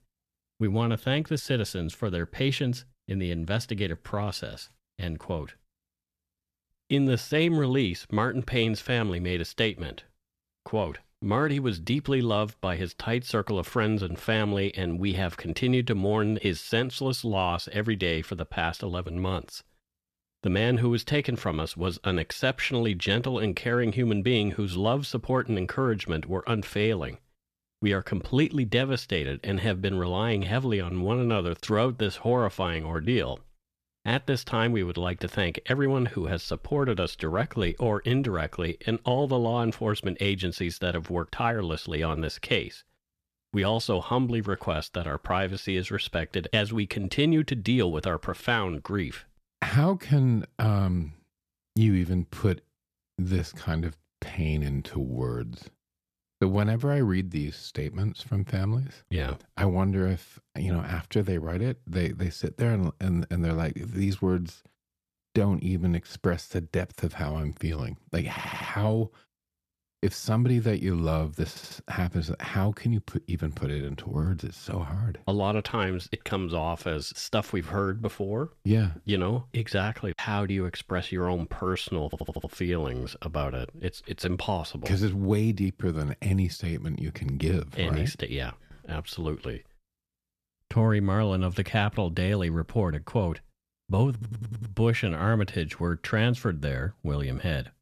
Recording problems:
audio stuttering; 4 times, first at 1:08

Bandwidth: 14 kHz